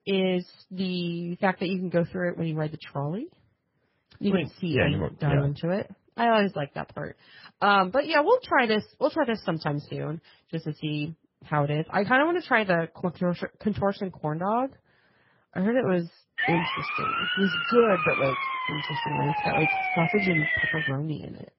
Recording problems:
garbled, watery; badly; nothing above 5.5 kHz
siren; loud; from 16 to 21 s; peak 3 dB above the speech

